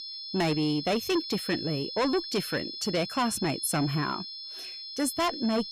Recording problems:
distortion; heavy; 8 dB below the speech
high-pitched whine; loud; throughout; 5 kHz, 7 dB below the speech

